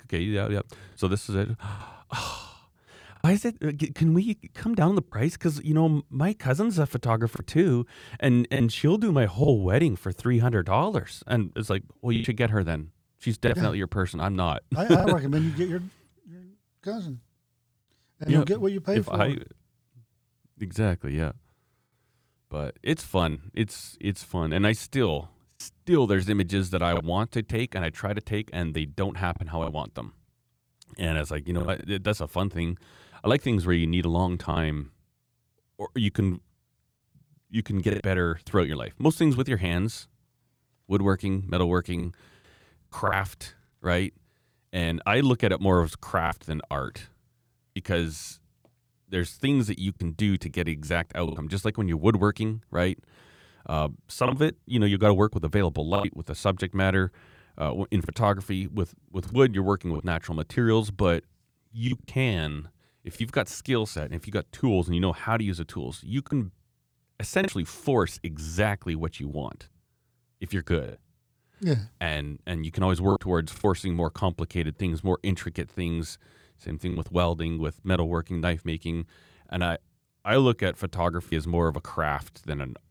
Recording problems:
choppy; occasionally; 3% of the speech affected

